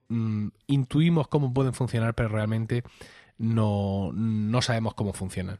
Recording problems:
none

